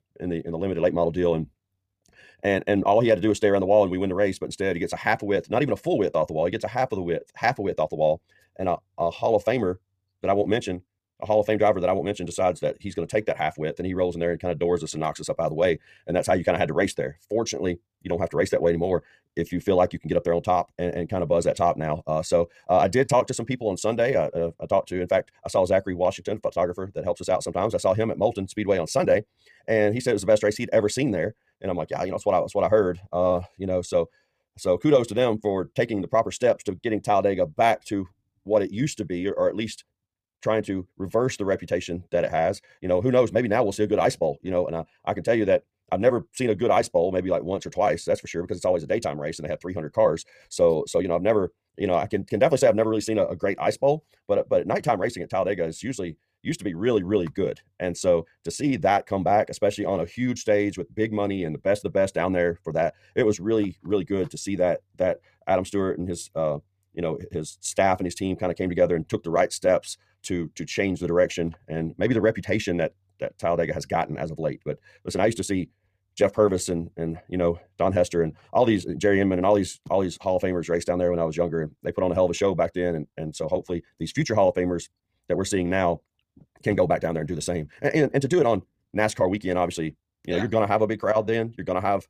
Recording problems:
wrong speed, natural pitch; too fast; 1.6 times normal speed

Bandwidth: 15 kHz